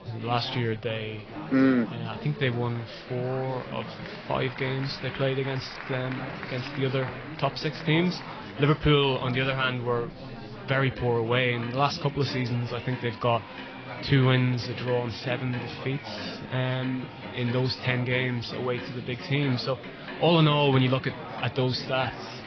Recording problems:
garbled, watery; badly
high frequencies cut off; noticeable; nothing above 5.5 kHz
household noises; noticeable; throughout; 15 dB below the speech
chatter from many people; noticeable; throughout; 10 dB below the speech

